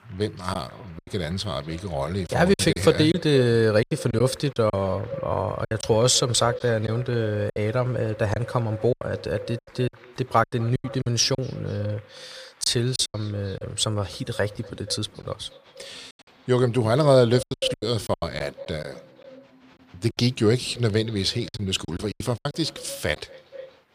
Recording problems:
echo of what is said; noticeable; throughout; 240 ms later, 15 dB below the speech
crowd noise; faint; throughout; 30 dB below the speech
choppy; very; 9% of the speech affected

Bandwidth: 15 kHz